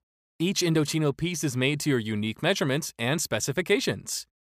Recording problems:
none

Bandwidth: 15 kHz